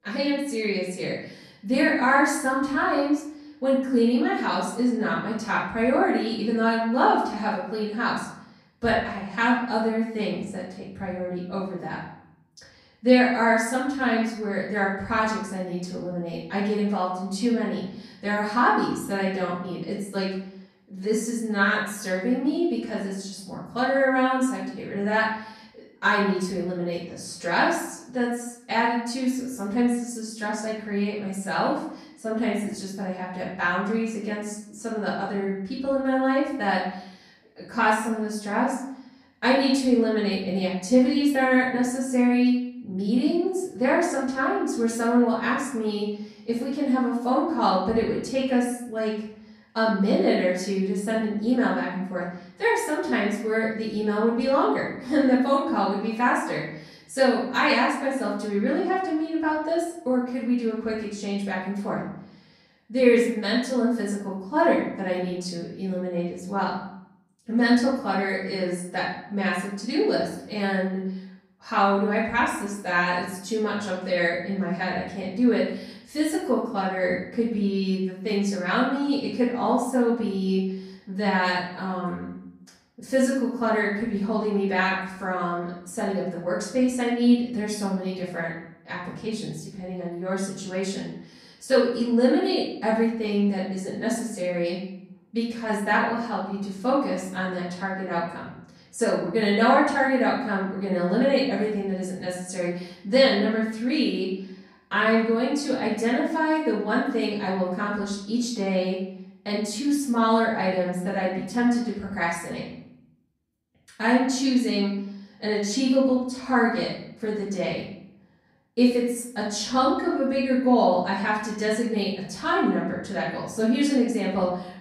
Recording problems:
off-mic speech; far
room echo; noticeable; dies away in 0.7 s

